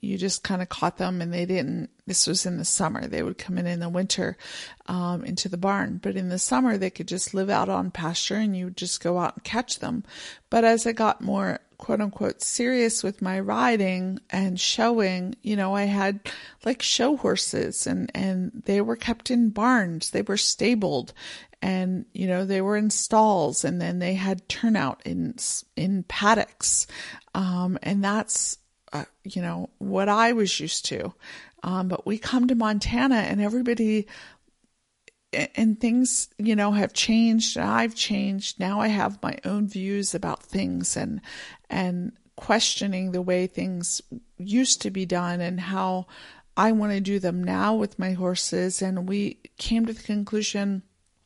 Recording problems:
garbled, watery; slightly; nothing above 11 kHz

